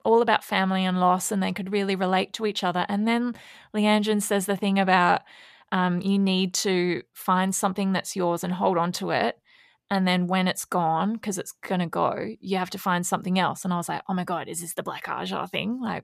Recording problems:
none

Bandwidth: 14.5 kHz